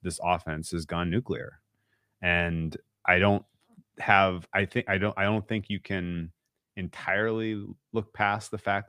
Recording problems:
none

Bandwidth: 15 kHz